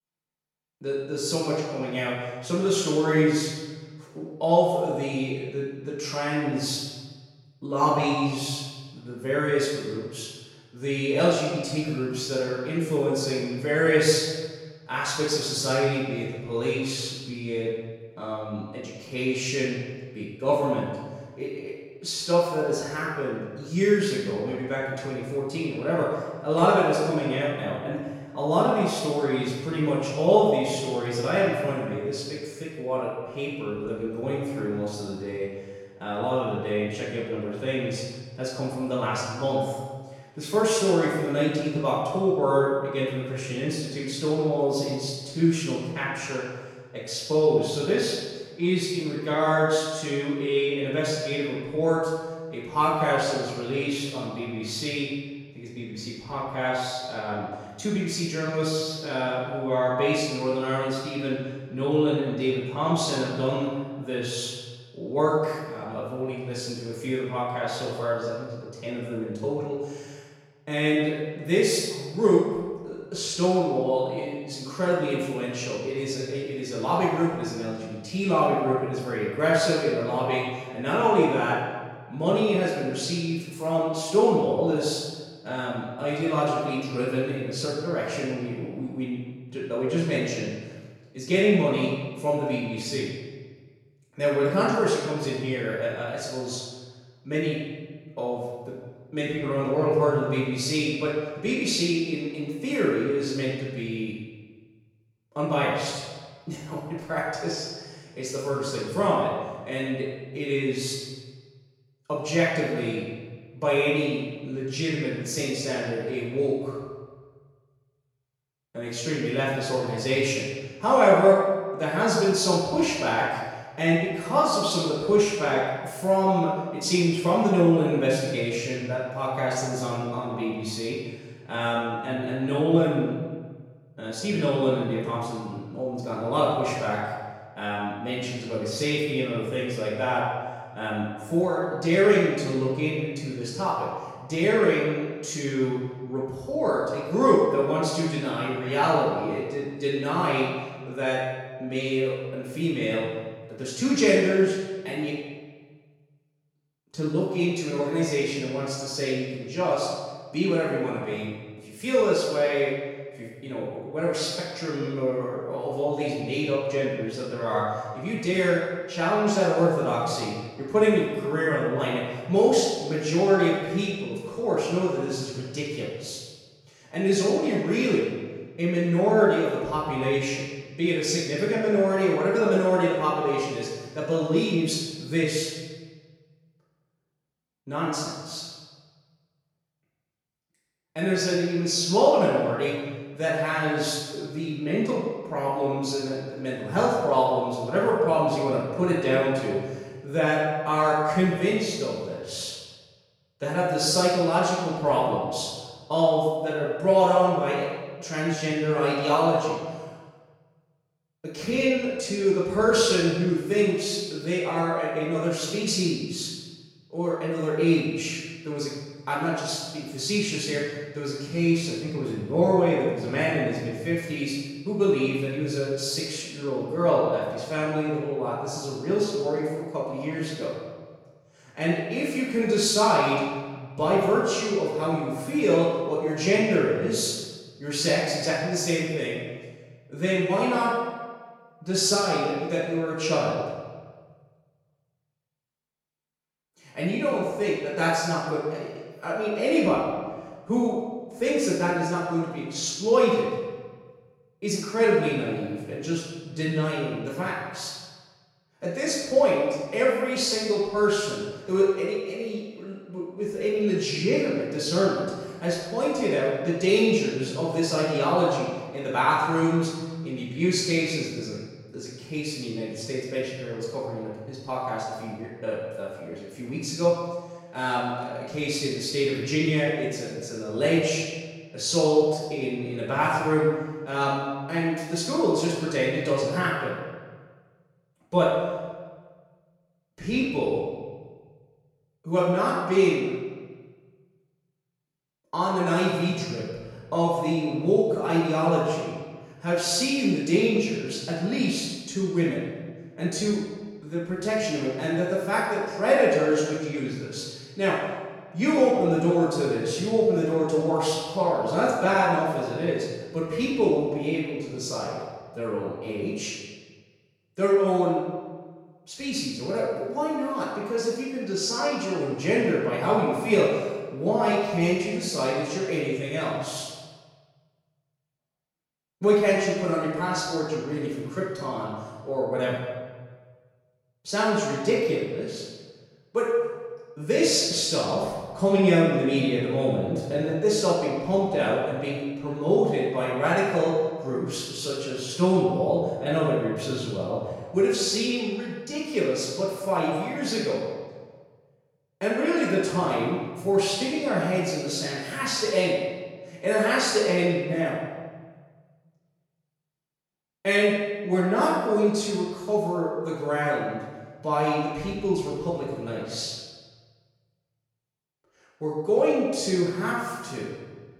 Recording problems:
room echo; strong; dies away in 1.3 s
off-mic speech; far

